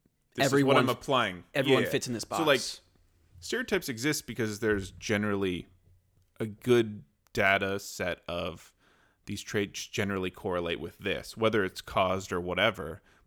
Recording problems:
none

